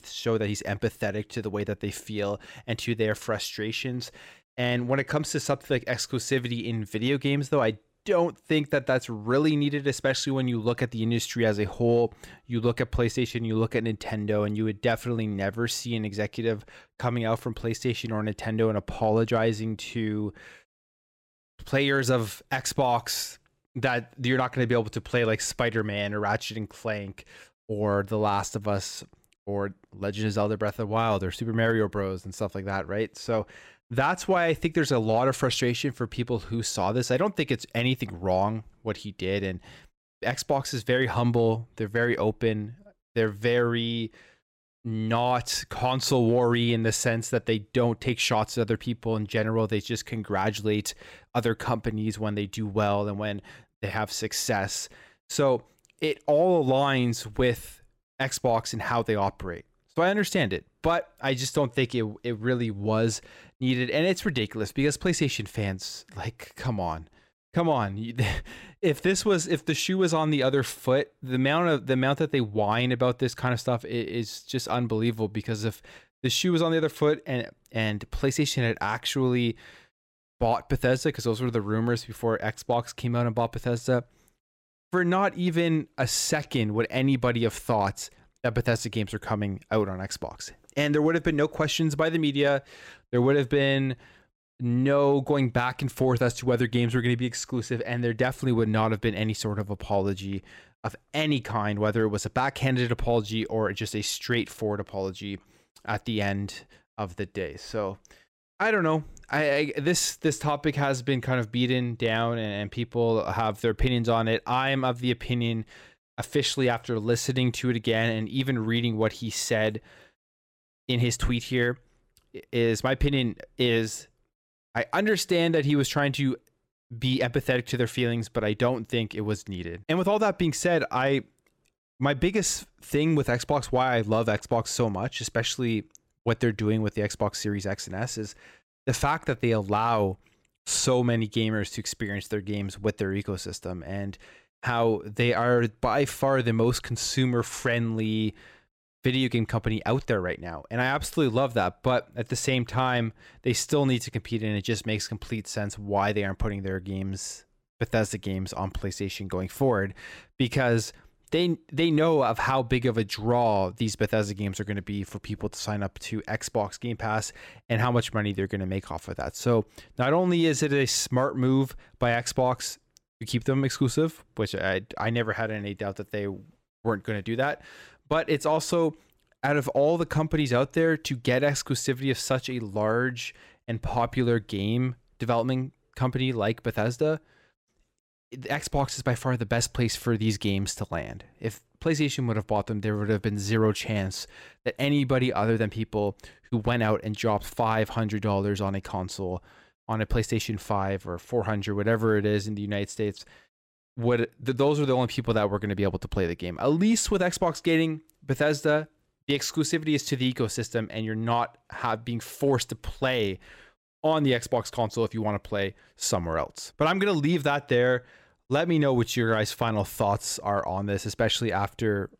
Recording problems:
none

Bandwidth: 16 kHz